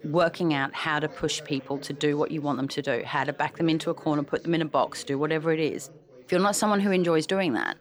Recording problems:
background chatter; faint; throughout; 4 voices, 20 dB below the speech

